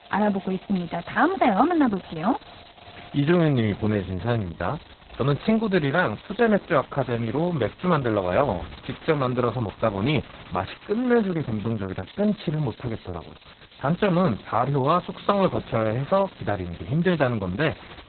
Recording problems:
garbled, watery; badly; nothing above 4 kHz
rain or running water; faint; throughout; 25 dB below the speech
hiss; faint; throughout; 25 dB below the speech

